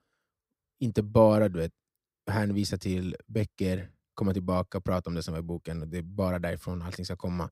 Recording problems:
none

